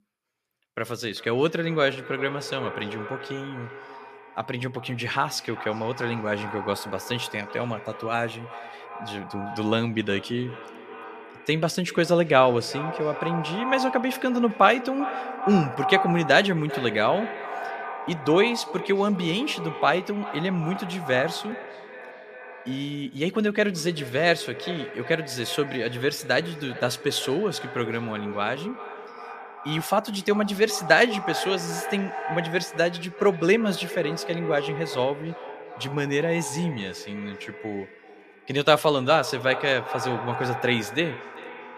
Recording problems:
echo of what is said; strong; throughout; 390 ms later, 10 dB below the speech

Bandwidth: 14.5 kHz